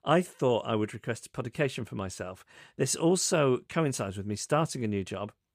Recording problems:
none

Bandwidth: 15 kHz